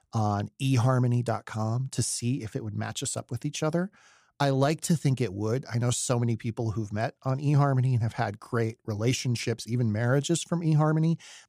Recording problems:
none

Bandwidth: 15 kHz